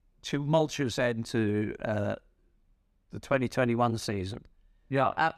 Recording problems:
none

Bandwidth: 14.5 kHz